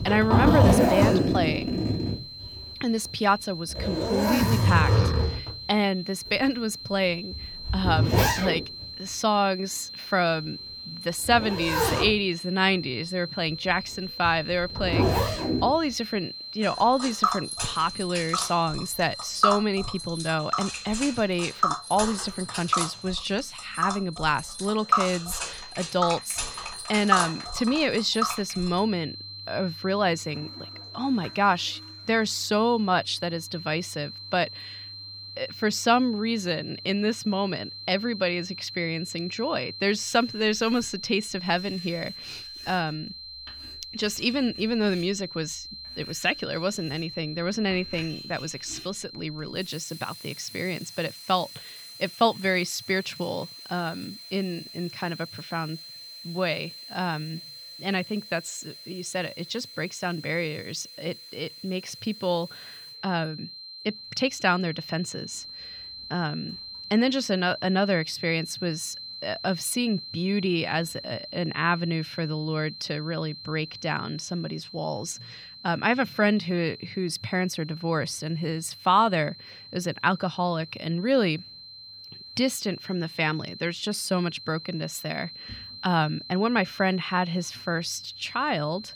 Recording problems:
household noises; very loud; throughout; as loud as the speech
high-pitched whine; noticeable; throughout; 4 kHz, 10 dB below the speech

